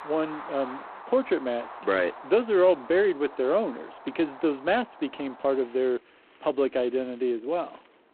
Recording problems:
phone-call audio; poor line; nothing above 4 kHz
wind in the background; noticeable; throughout; 15 dB below the speech

